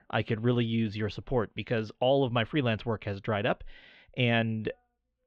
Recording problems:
muffled; slightly; fading above 3.5 kHz

